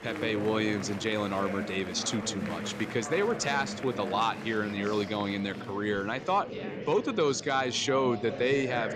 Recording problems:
murmuring crowd; loud; throughout; 9 dB below the speech

